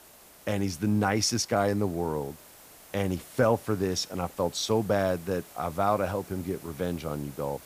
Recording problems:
hiss; faint; throughout; 20 dB below the speech

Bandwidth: 15 kHz